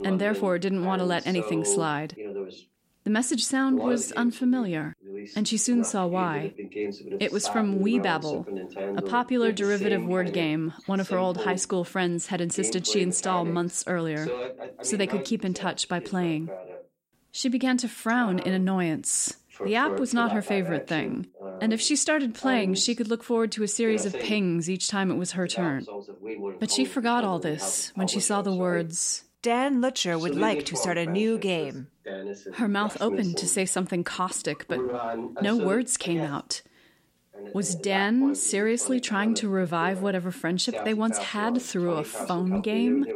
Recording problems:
voice in the background; loud; throughout; 9 dB below the speech

